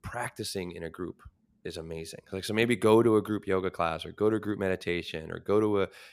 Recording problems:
none

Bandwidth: 14.5 kHz